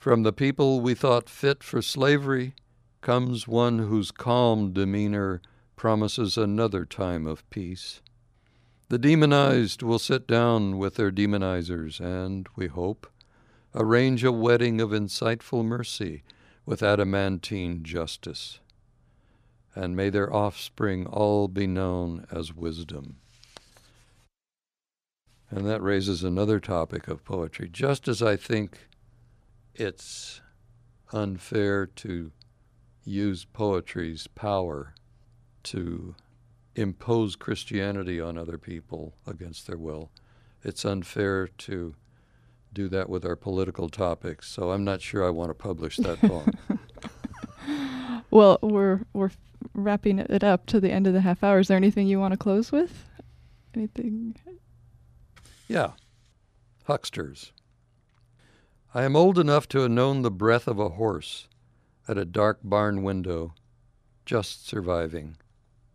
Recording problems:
none

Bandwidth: 14.5 kHz